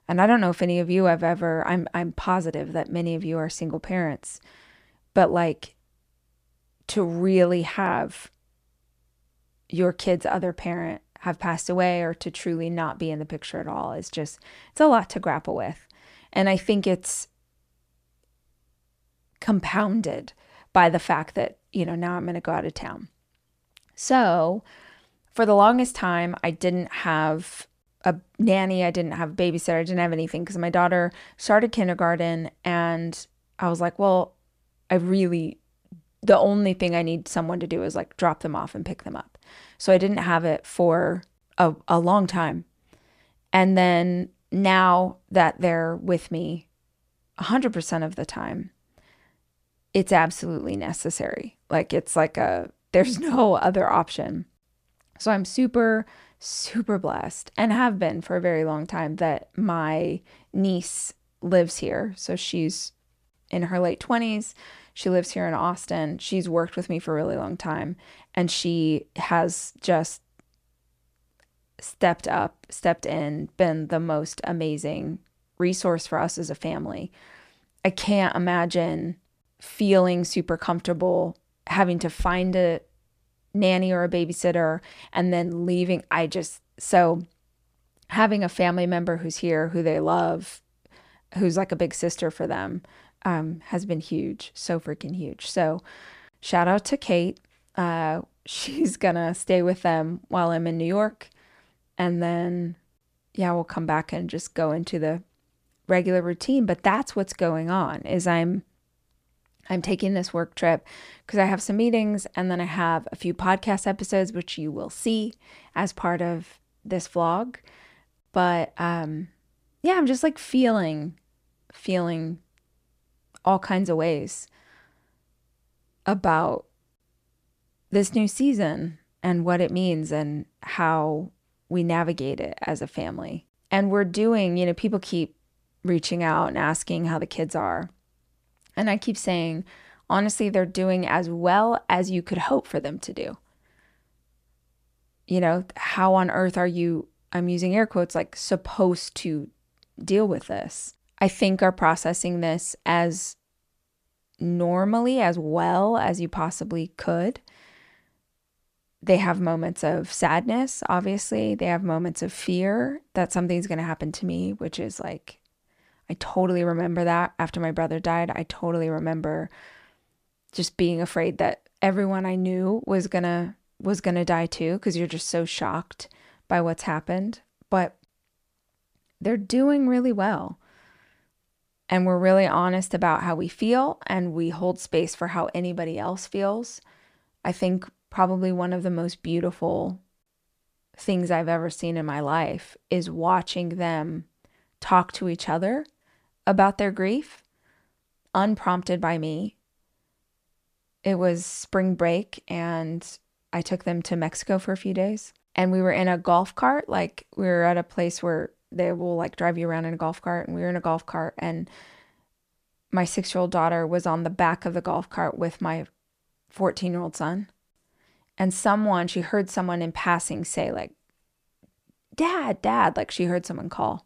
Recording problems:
none

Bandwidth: 14.5 kHz